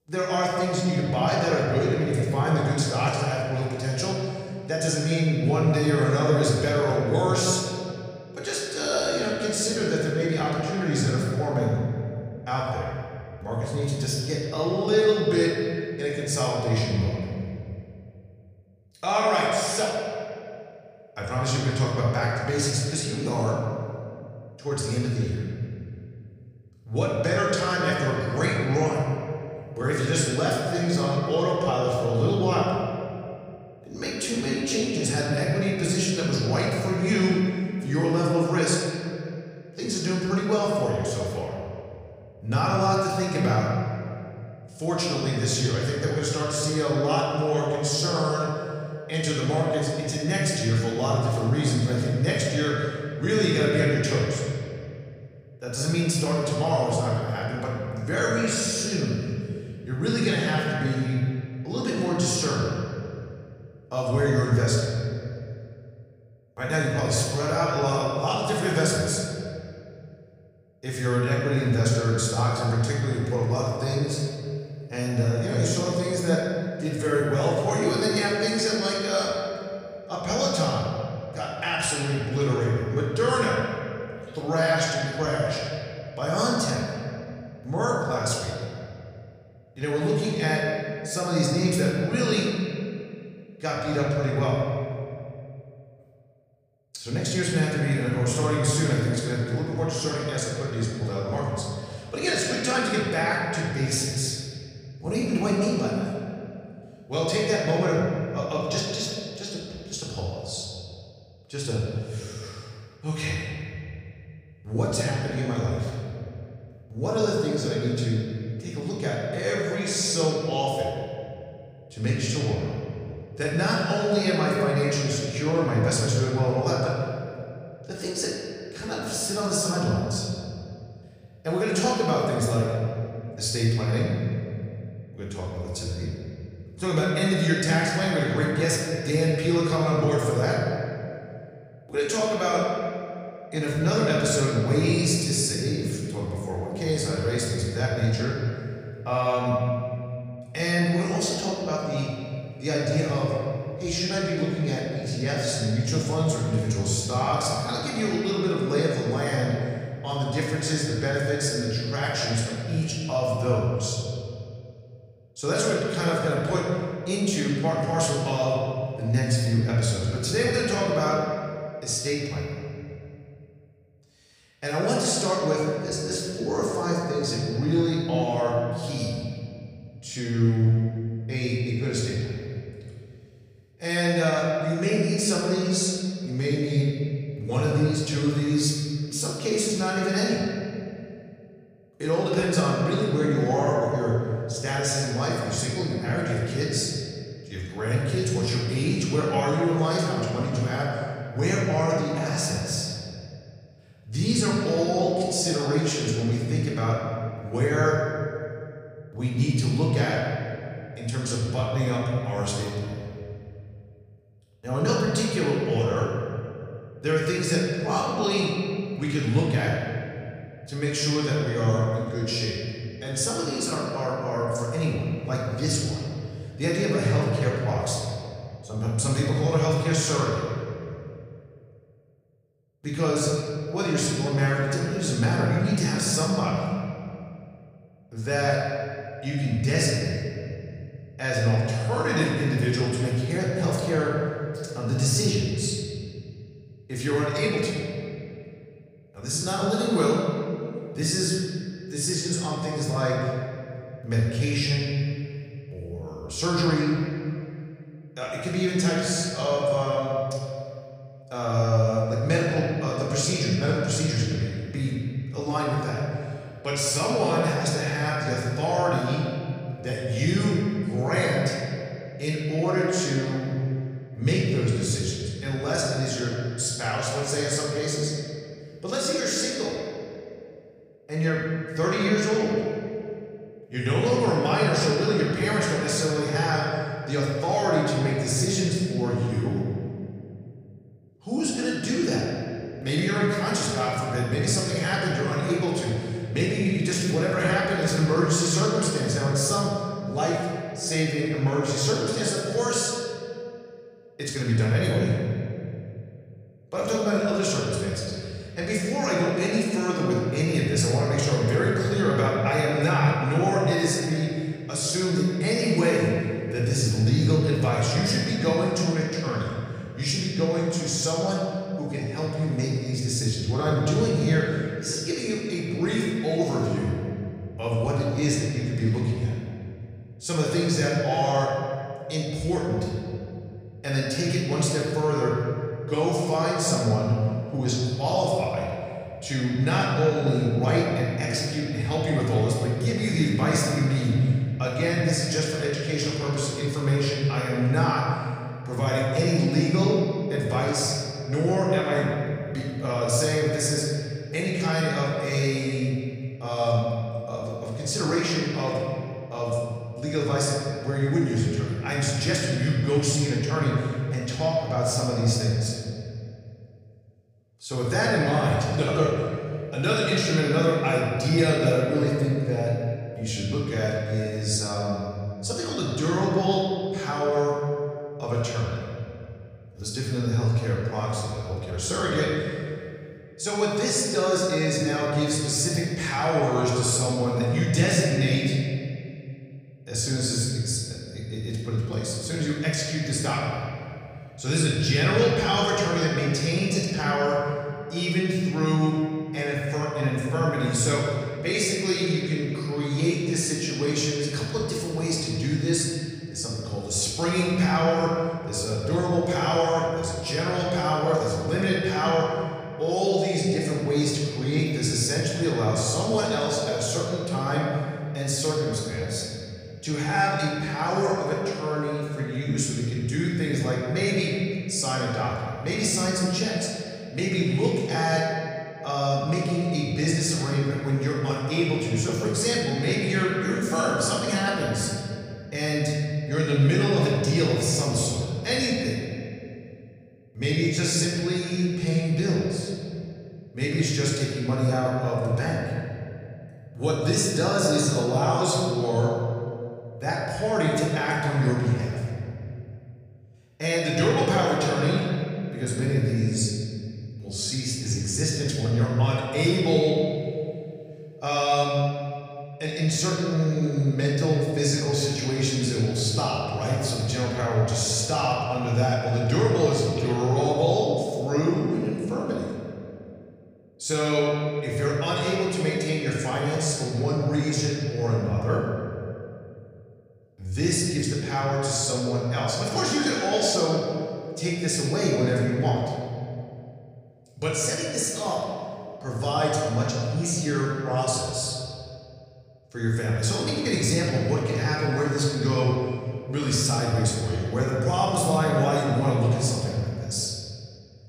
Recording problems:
off-mic speech; far
room echo; noticeable; dies away in 2.3 s

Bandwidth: 15 kHz